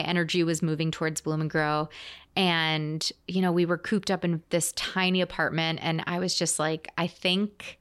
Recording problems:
abrupt cut into speech; at the start

